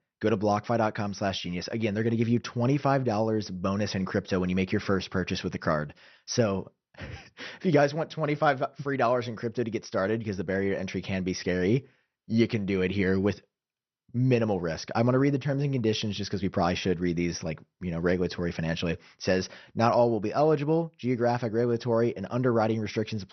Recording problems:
garbled, watery; slightly; nothing above 6 kHz

